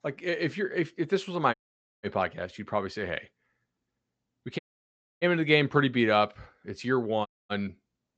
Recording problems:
high frequencies cut off; noticeable; nothing above 8 kHz
audio cutting out; at 1.5 s, at 4.5 s for 0.5 s and at 7.5 s

